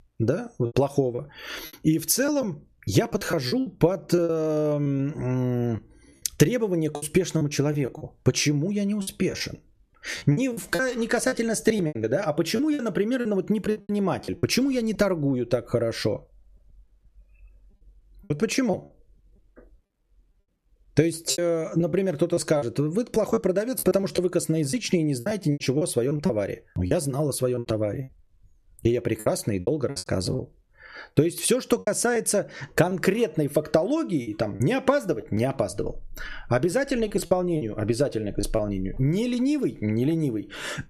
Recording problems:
squashed, flat; somewhat
choppy; very; 9% of the speech affected

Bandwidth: 14 kHz